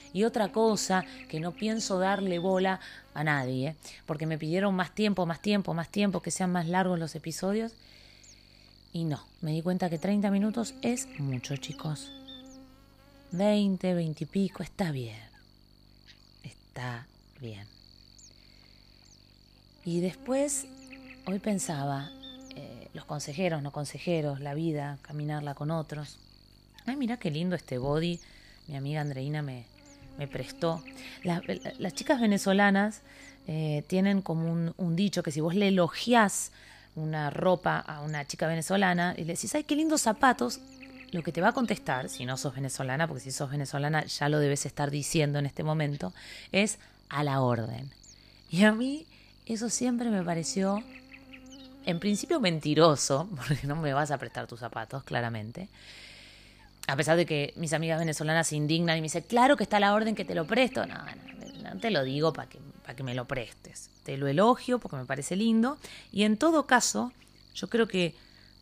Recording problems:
electrical hum; faint; throughout; 50 Hz, 25 dB below the speech

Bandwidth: 15 kHz